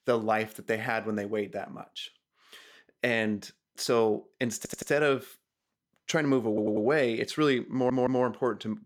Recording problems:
audio stuttering; at 4.5 s, at 6.5 s and at 7.5 s

